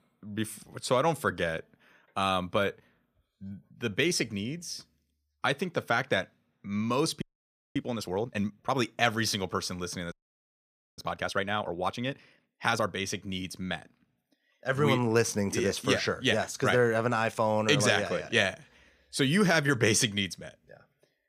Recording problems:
audio freezing; at 7 s for 0.5 s and at 10 s for 1 s

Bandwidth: 15 kHz